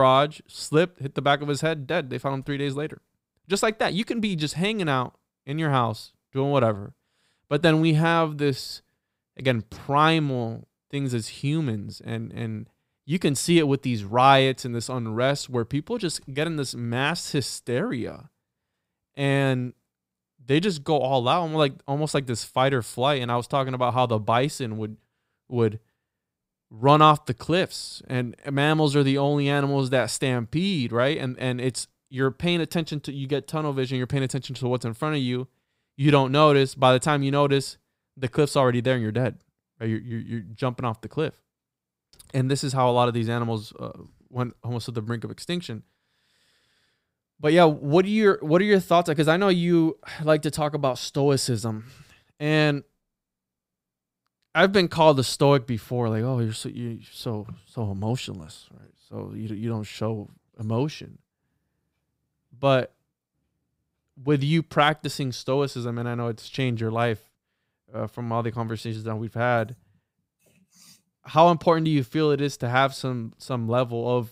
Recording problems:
abrupt cut into speech; at the start

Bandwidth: 15.5 kHz